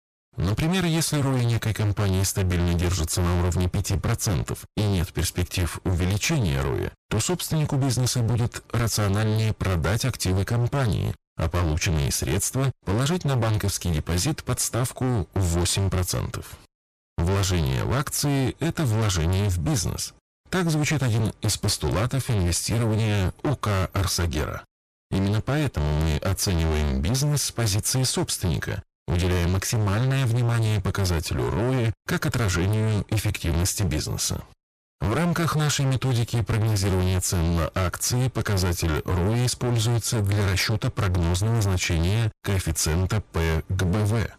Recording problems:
distortion; heavy; 35% of the sound clipped

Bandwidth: 14.5 kHz